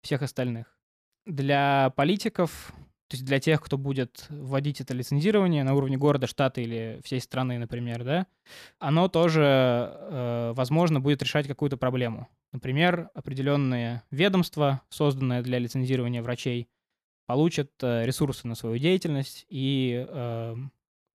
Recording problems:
none

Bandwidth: 14.5 kHz